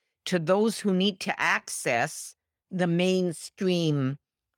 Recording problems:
none

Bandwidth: 17.5 kHz